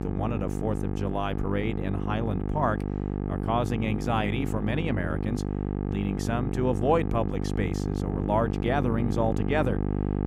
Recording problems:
electrical hum; loud; throughout; 50 Hz, 6 dB below the speech

